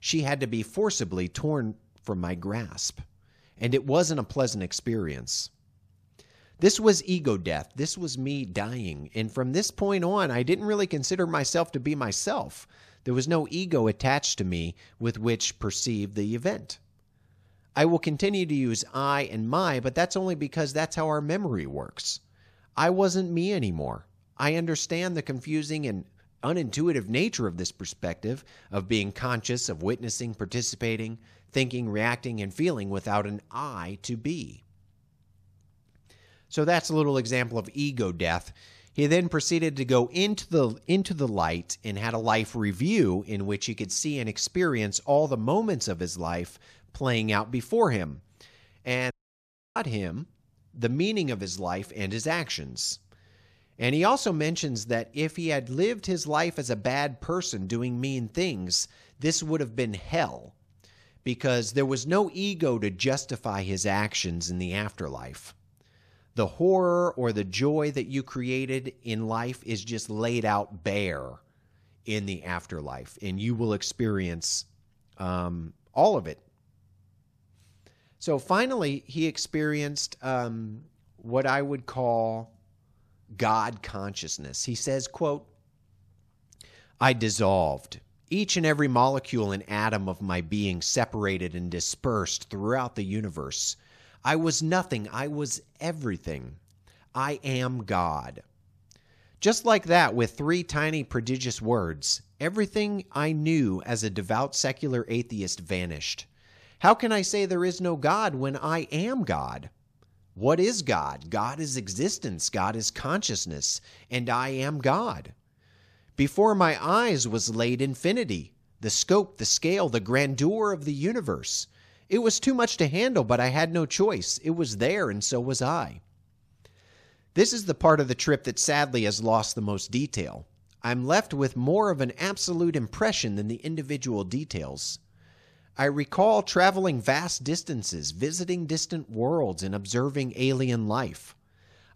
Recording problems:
audio cutting out; at 49 s for 0.5 s

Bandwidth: 14.5 kHz